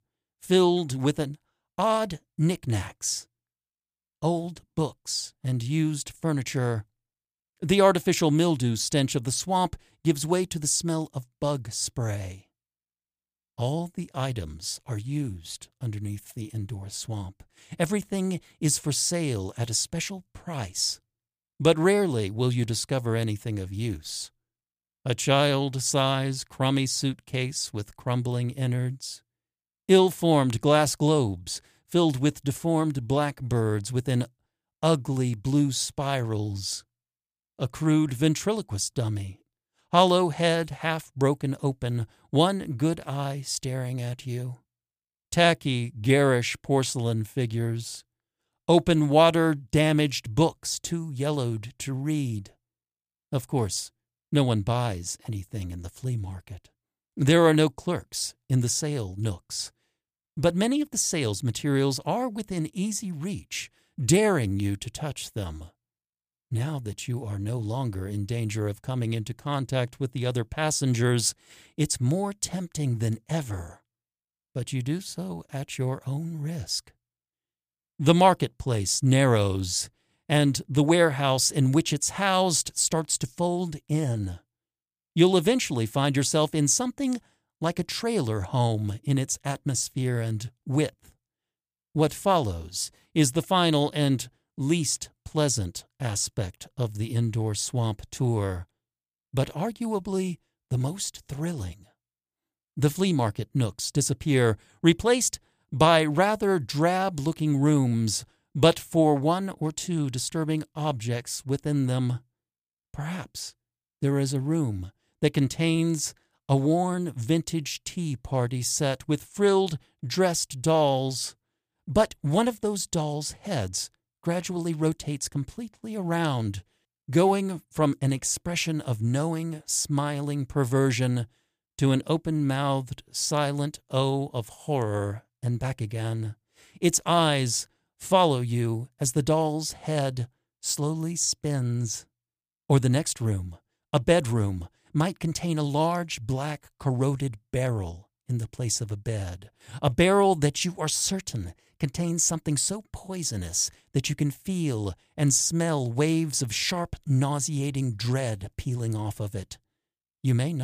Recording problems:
abrupt cut into speech; at the end

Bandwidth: 15 kHz